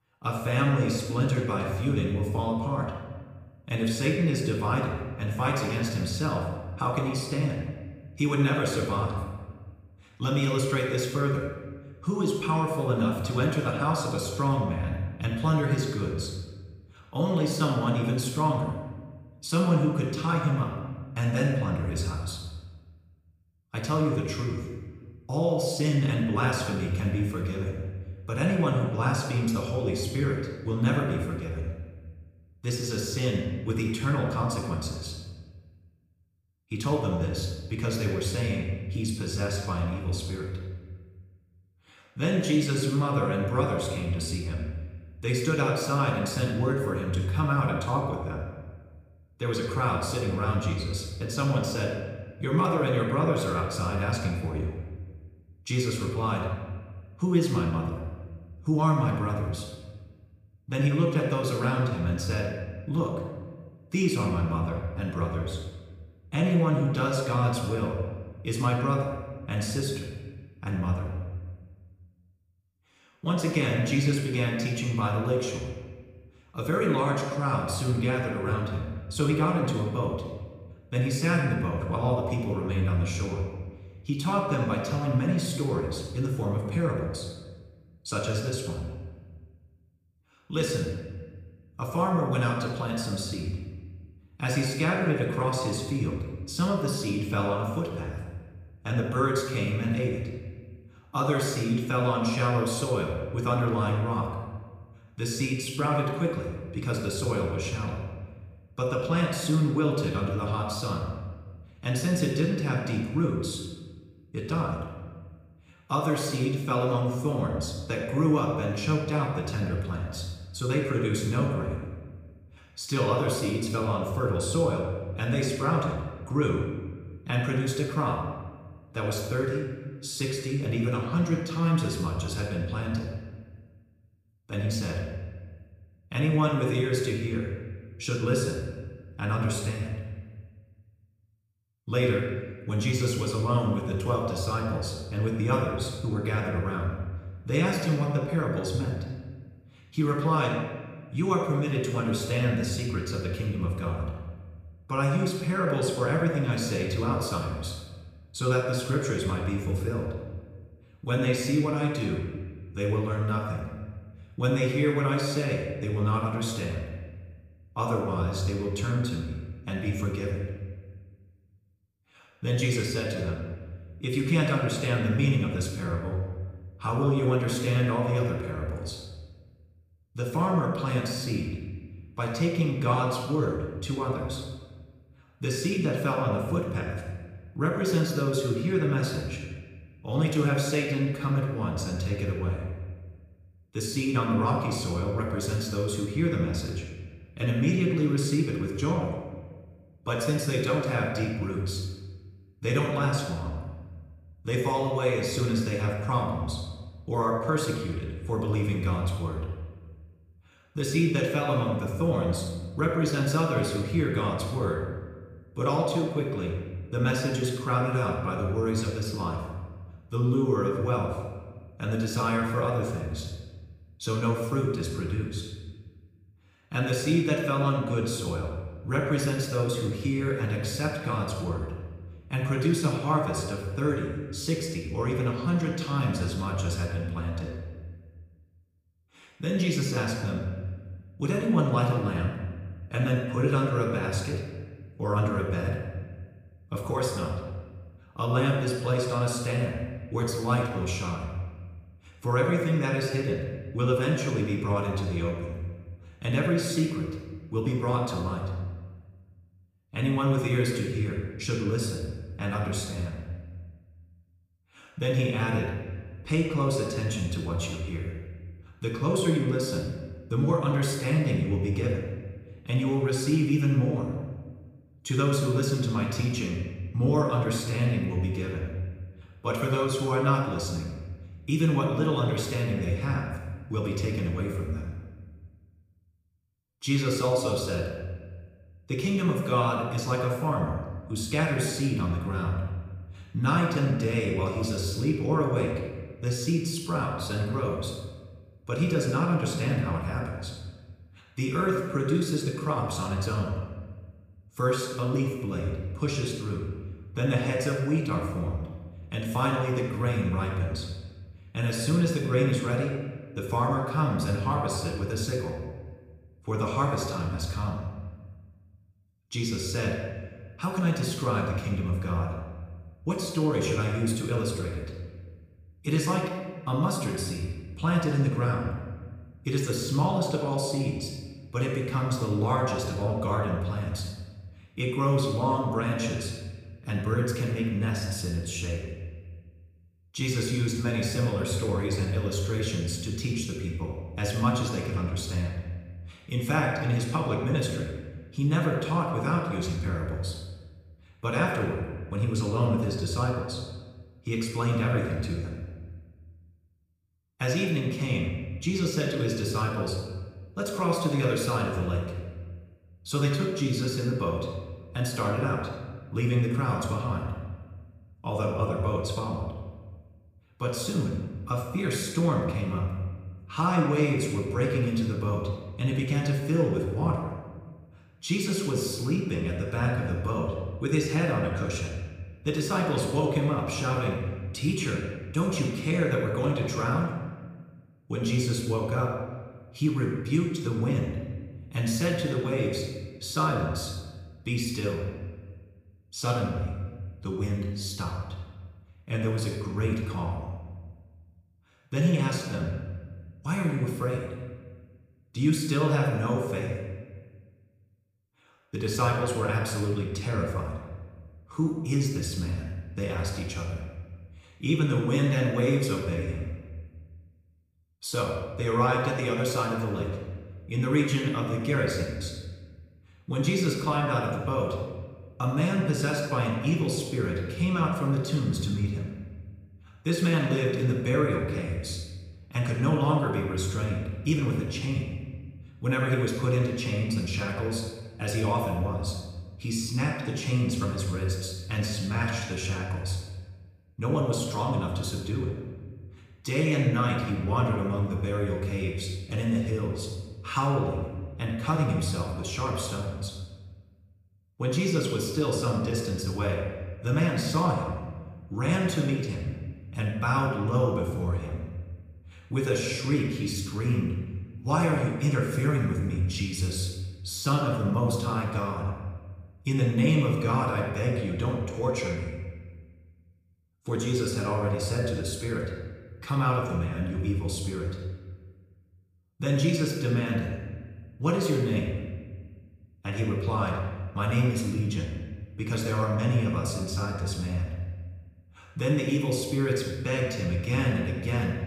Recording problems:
off-mic speech; far
room echo; noticeable; dies away in 1.2 s

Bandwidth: 15 kHz